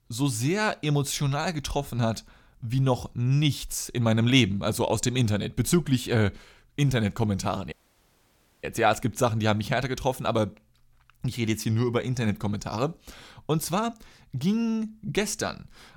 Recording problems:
audio cutting out; at 7.5 s for 1 s

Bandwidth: 17.5 kHz